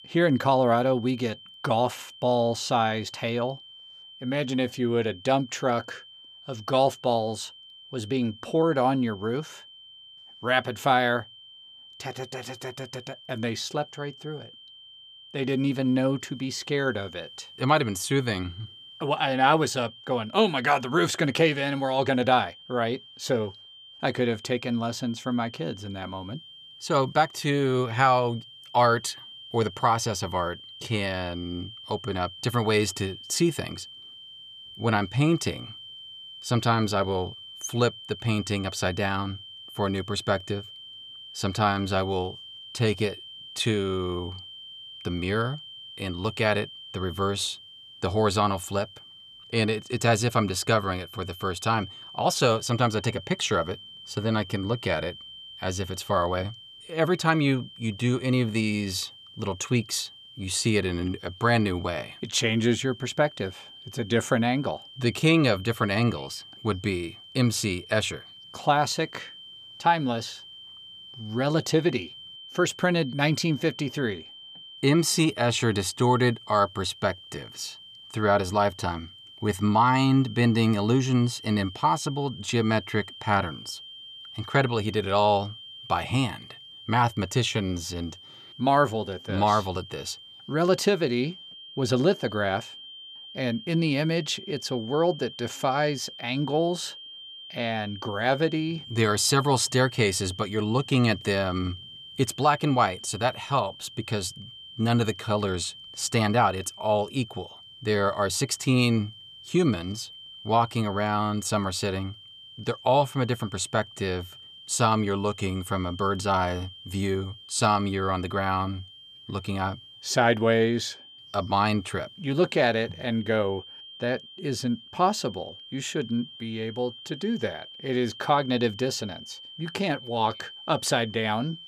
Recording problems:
high-pitched whine; noticeable; throughout; 3 kHz, 15 dB below the speech

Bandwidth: 14.5 kHz